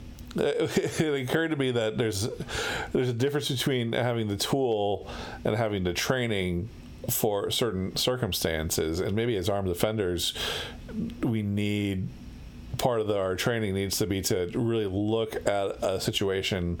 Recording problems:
squashed, flat; heavily

